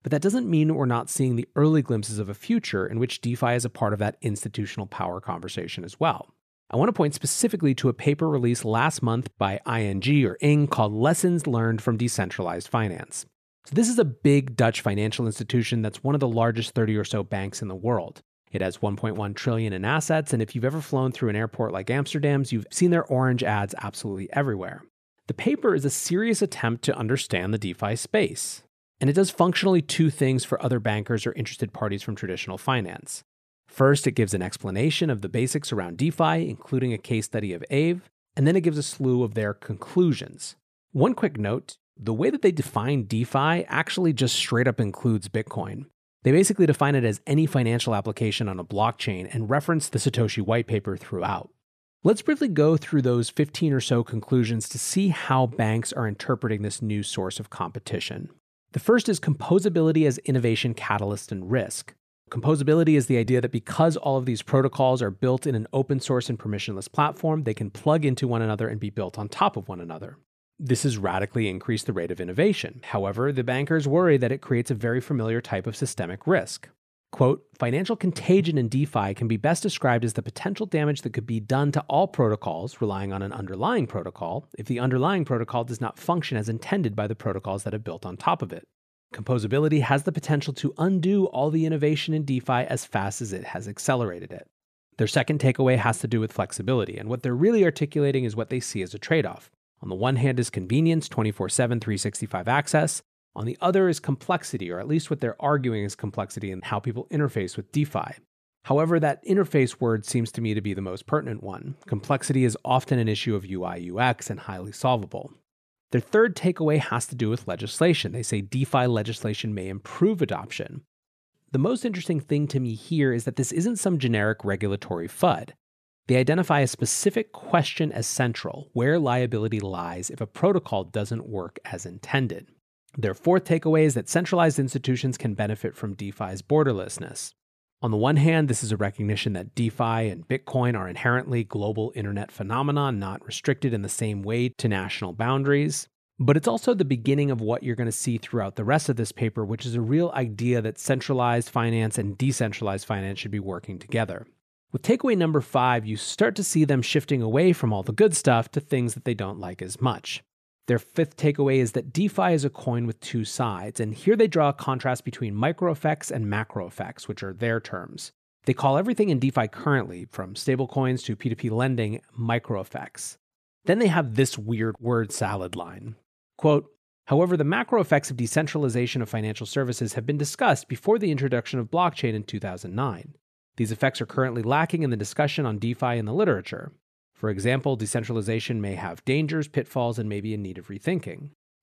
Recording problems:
none

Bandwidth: 14.5 kHz